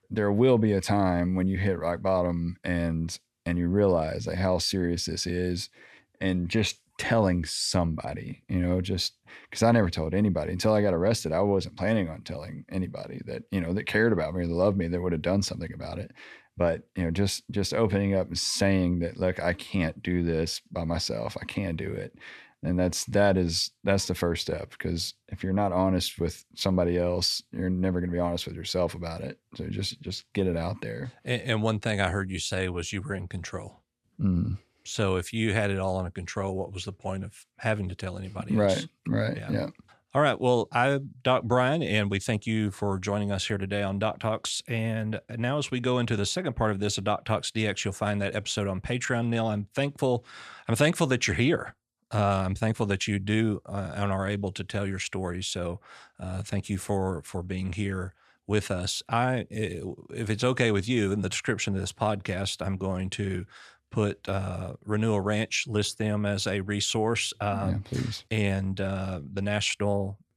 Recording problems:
none

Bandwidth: 13.5 kHz